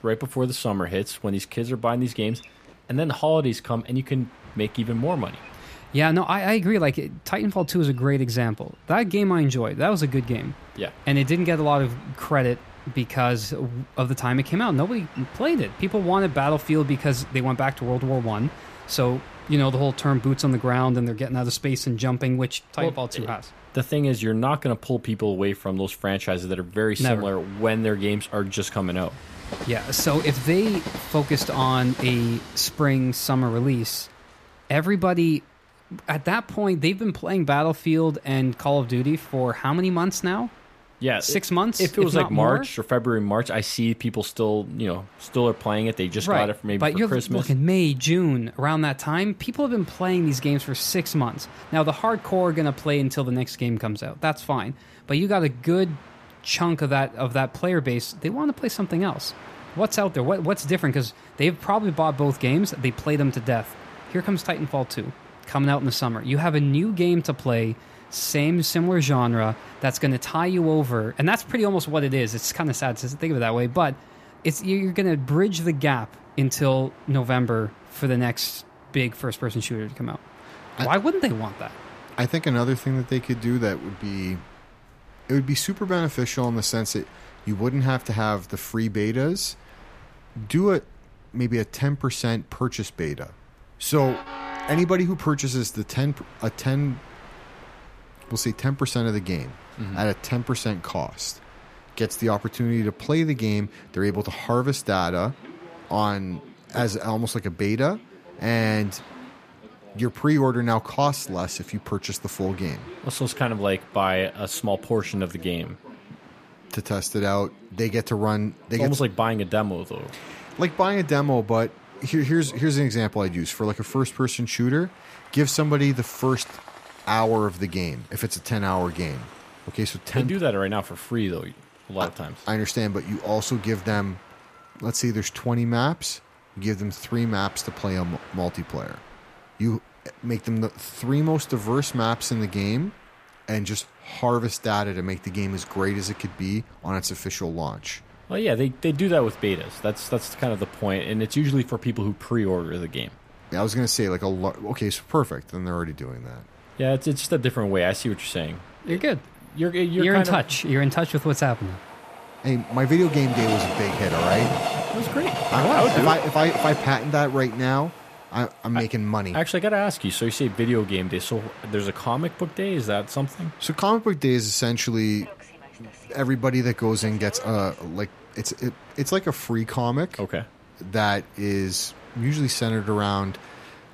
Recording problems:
train or aircraft noise; noticeable; throughout; 15 dB below the speech

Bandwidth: 14.5 kHz